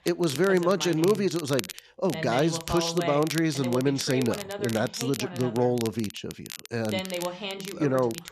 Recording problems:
voice in the background; loud; throughout; 9 dB below the speech
crackle, like an old record; noticeable; 15 dB below the speech

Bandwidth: 13.5 kHz